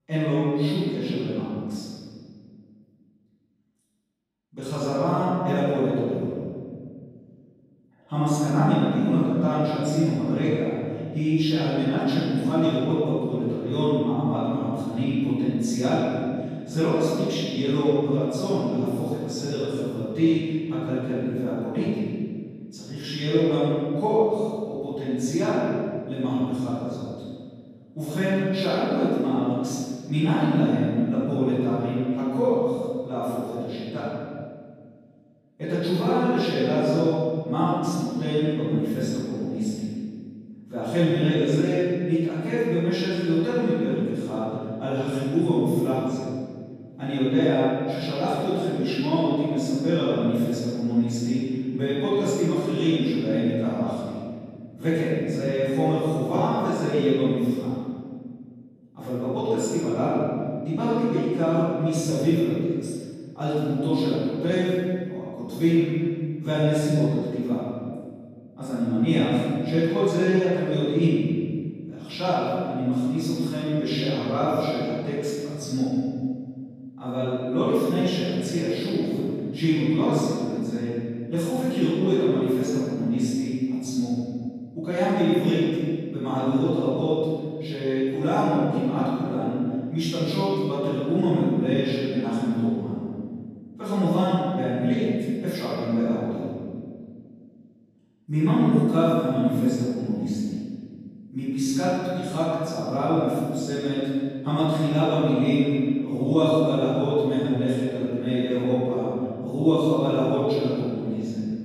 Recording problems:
room echo; strong; dies away in 1.8 s
off-mic speech; far

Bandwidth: 14.5 kHz